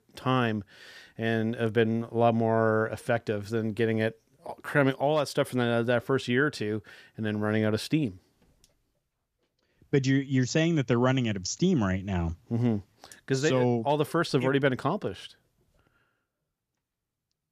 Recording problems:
none

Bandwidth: 14.5 kHz